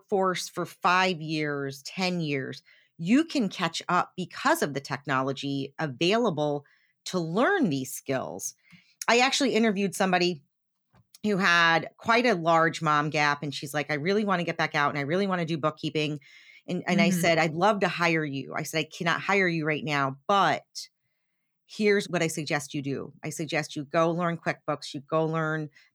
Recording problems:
none

